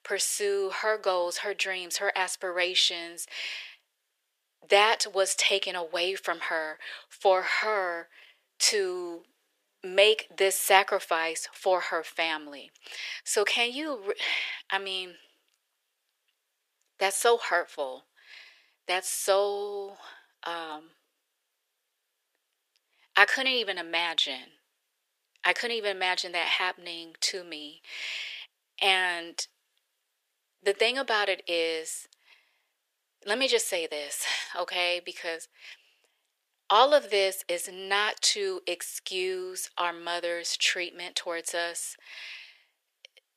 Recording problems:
thin; very; fading below 450 Hz

